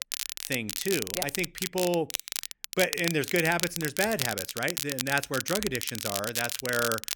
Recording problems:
crackle, like an old record; loud; 3 dB below the speech

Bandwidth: 17.5 kHz